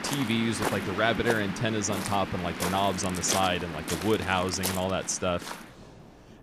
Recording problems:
rain or running water; loud; throughout; 5 dB below the speech

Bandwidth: 15 kHz